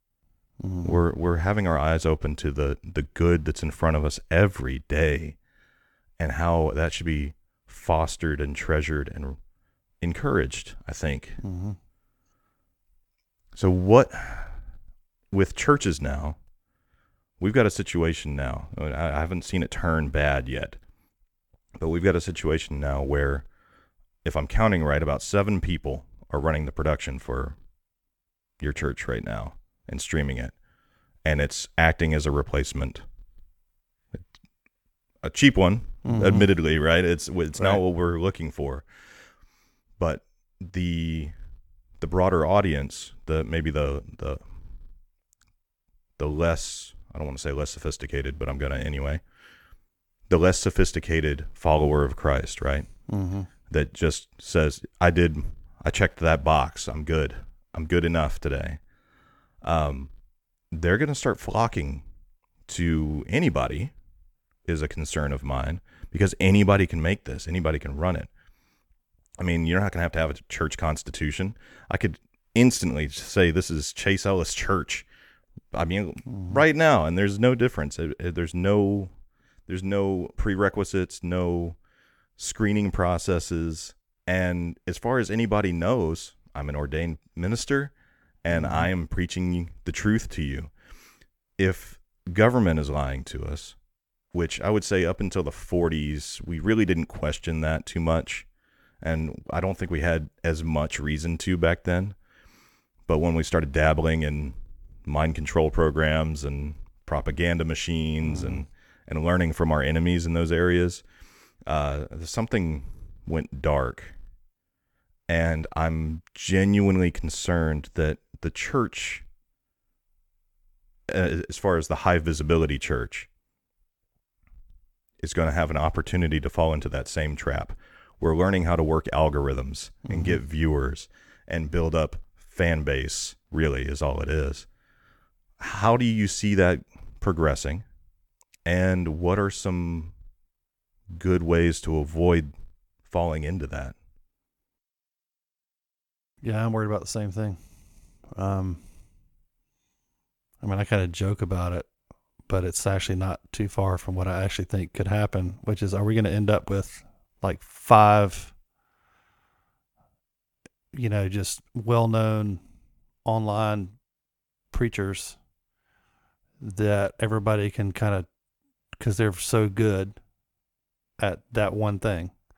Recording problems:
none

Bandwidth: 18.5 kHz